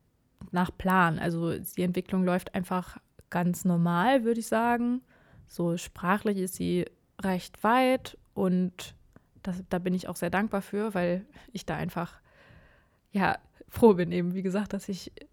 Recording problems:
none

